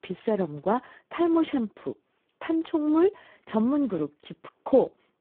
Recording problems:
phone-call audio; poor line

